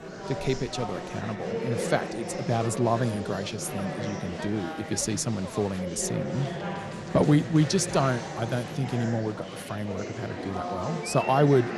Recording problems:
chatter from many people; loud; throughout; 6 dB below the speech

